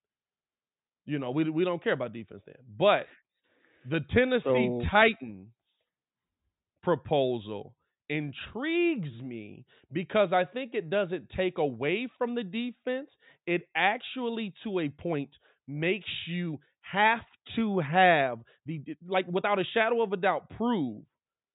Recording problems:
high frequencies cut off; severe; nothing above 4 kHz
uneven, jittery; strongly; from 4 to 19 s

